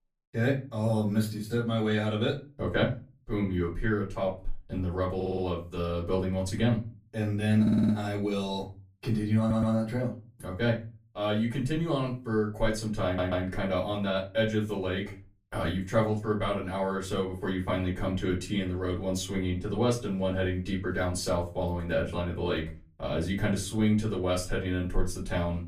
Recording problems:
off-mic speech; far
room echo; very slight; dies away in 0.3 s
audio stuttering; 4 times, first at 5 s

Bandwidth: 15 kHz